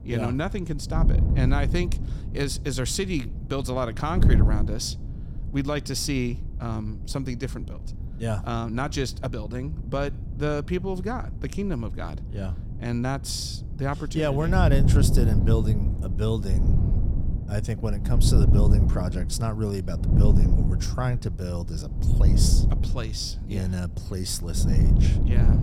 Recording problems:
wind noise on the microphone; heavy; 8 dB below the speech

